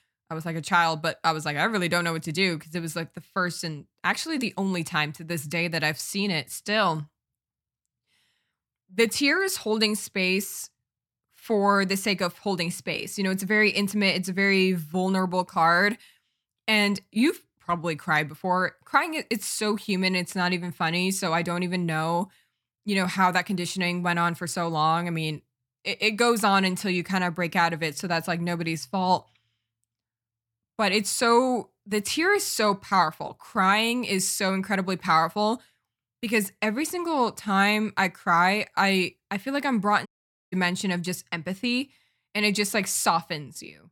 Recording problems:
audio cutting out; at 40 s

